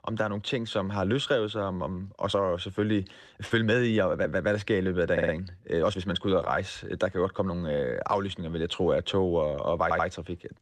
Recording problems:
uneven, jittery; strongly; from 2.5 to 7.5 s
audio stuttering; at 5 s and at 10 s

